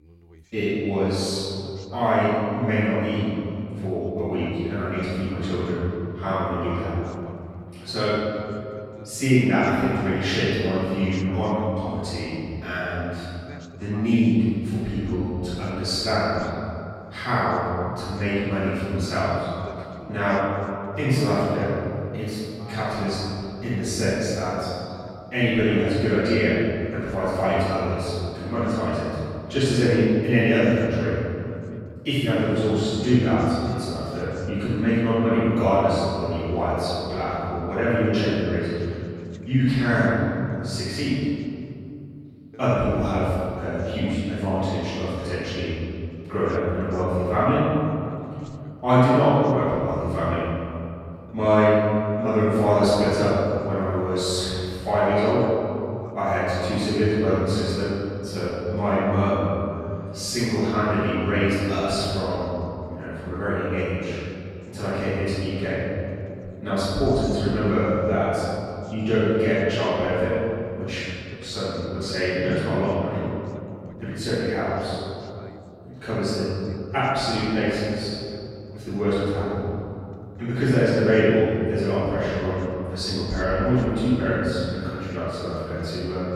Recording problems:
room echo; strong; dies away in 2.6 s
off-mic speech; far
voice in the background; faint; throughout; 25 dB below the speech

